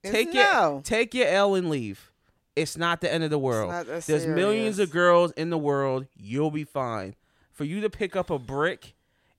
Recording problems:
none

